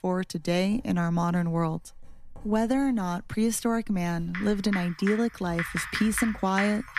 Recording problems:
household noises; loud; throughout; 7 dB below the speech

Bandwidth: 14.5 kHz